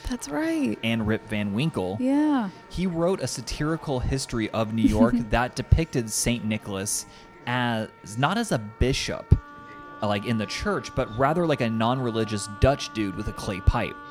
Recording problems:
background music; faint; throughout; 20 dB below the speech
murmuring crowd; faint; throughout; 25 dB below the speech

